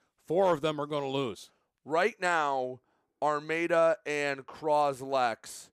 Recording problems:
none

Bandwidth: 14.5 kHz